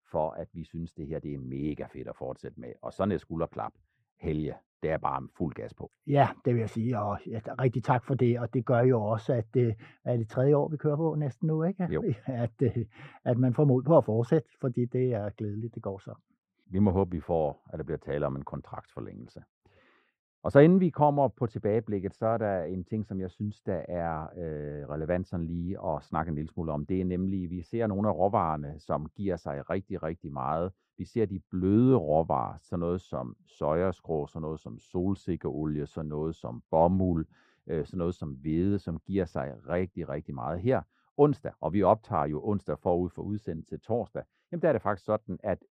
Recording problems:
muffled; very; fading above 2.5 kHz

